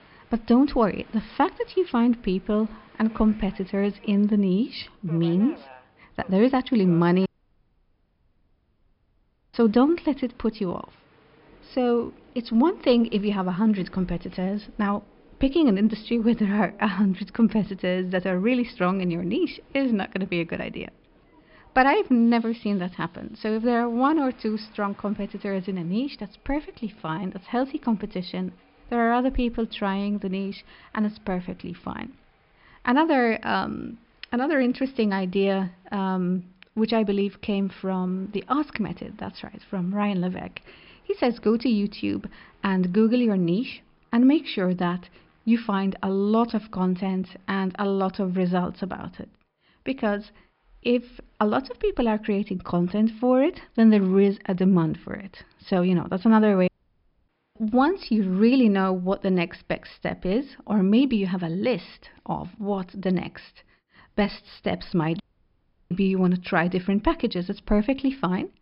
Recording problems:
high frequencies cut off; noticeable; nothing above 5 kHz
train or aircraft noise; faint; throughout; 30 dB below the speech
audio cutting out; at 7.5 s for 2.5 s, at 57 s for 0.5 s and at 1:05 for 0.5 s

